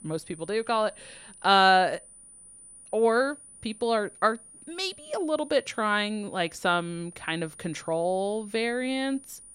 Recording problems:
high-pitched whine; faint; throughout; 9.5 kHz, 20 dB below the speech

